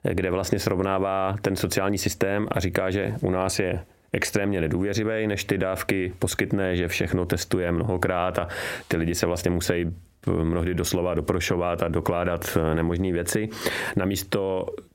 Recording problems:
squashed, flat; heavily

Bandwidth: 16 kHz